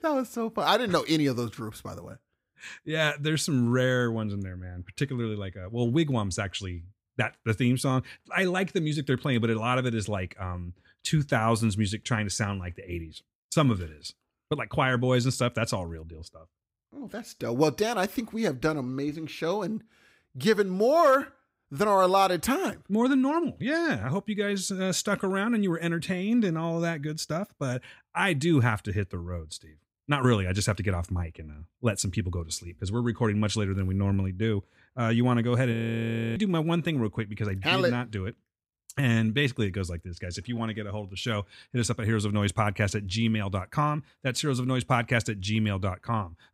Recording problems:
audio freezing; at 36 s for 0.5 s

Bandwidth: 15.5 kHz